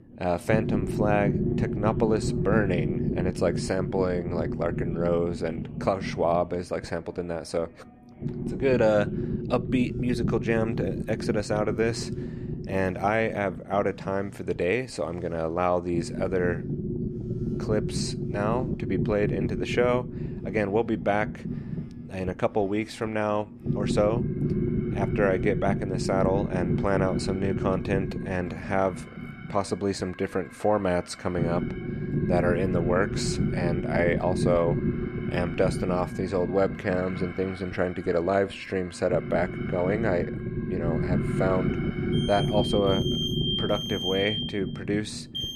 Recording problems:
low rumble; loud; throughout; 9 dB below the speech
alarms or sirens; noticeable; throughout; 10 dB below the speech

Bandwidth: 14 kHz